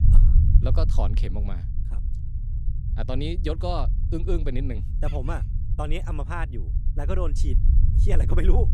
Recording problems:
low rumble; loud; throughout; 9 dB below the speech

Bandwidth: 15.5 kHz